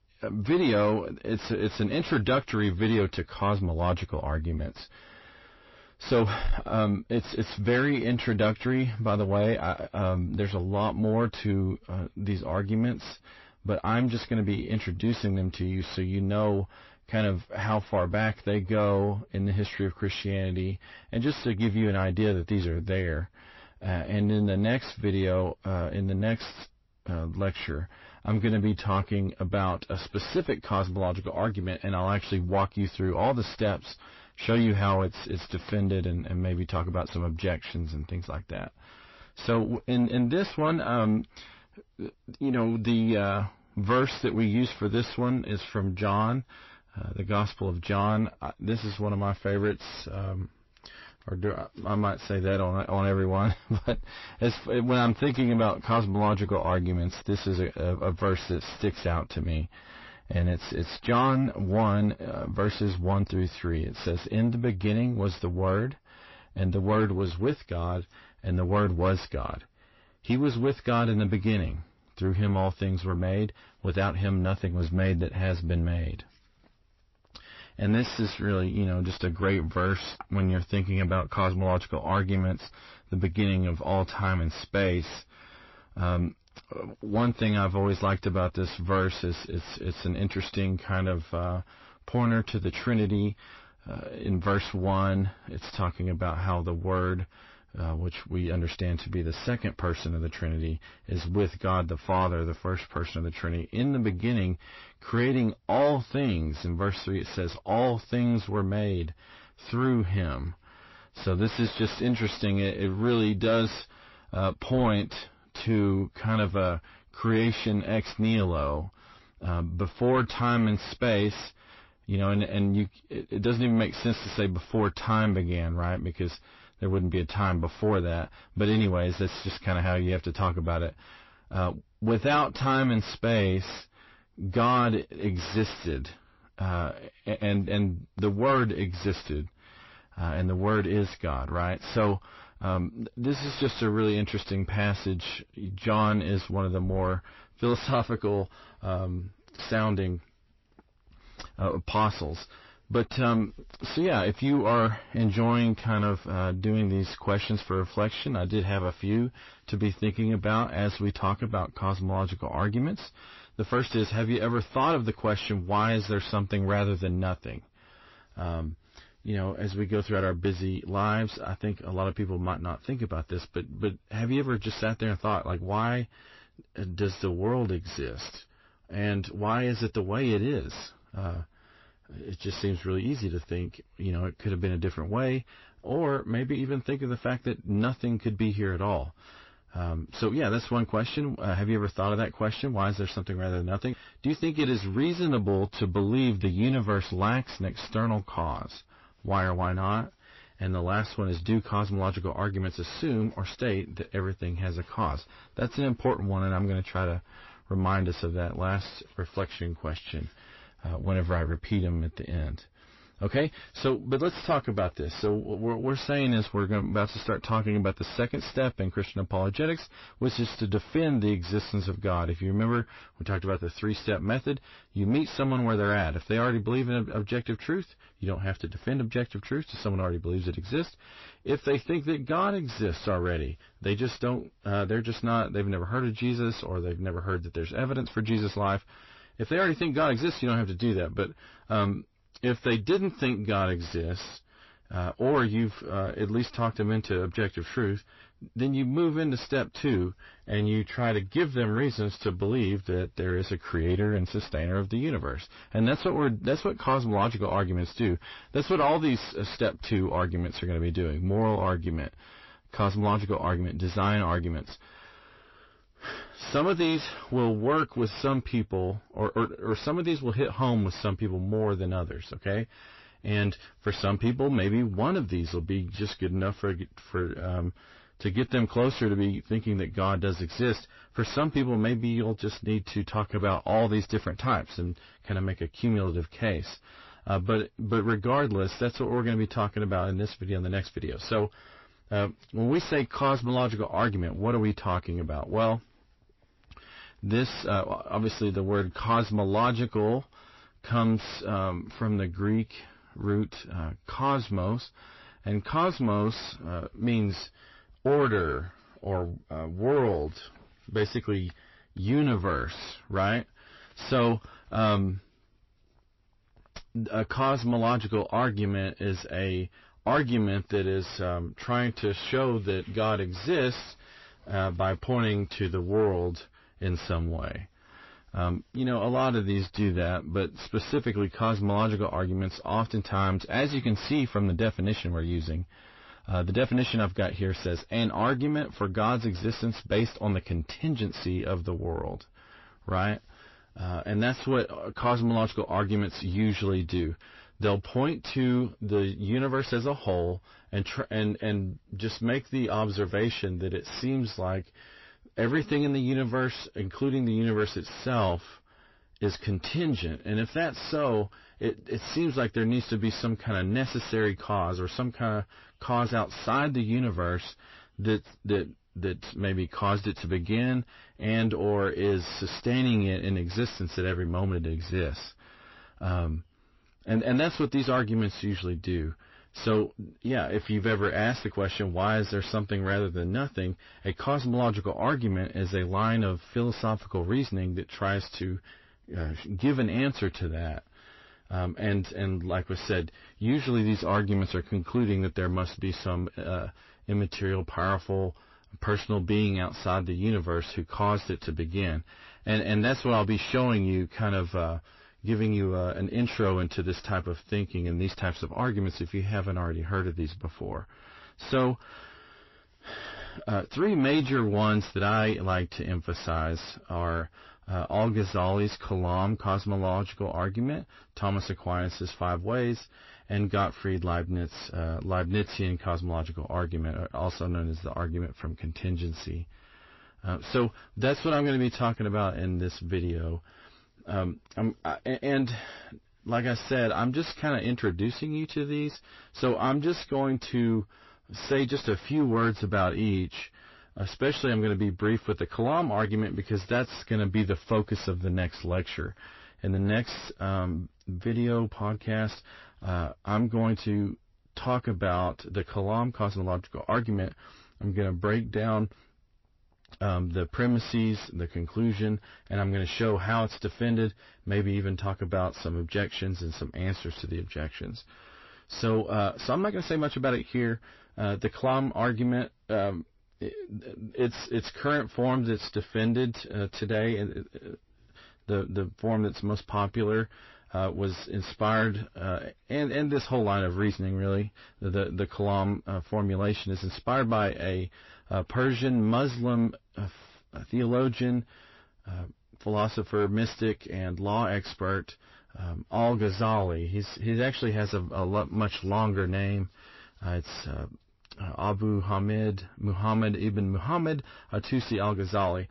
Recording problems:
distortion; slight; 8 dB below the speech
garbled, watery; slightly; nothing above 5.5 kHz

